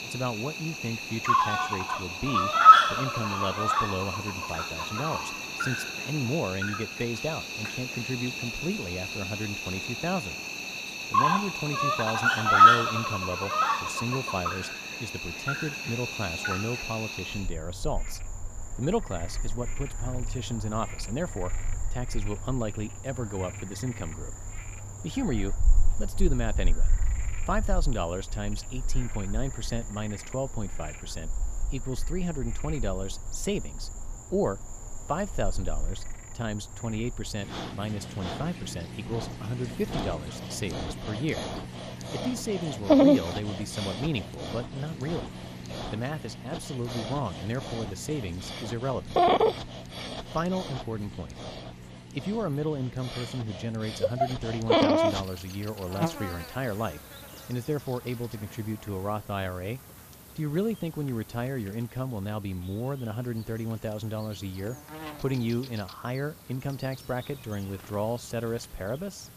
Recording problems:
animal sounds; very loud; throughout; 5 dB above the speech

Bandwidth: 14.5 kHz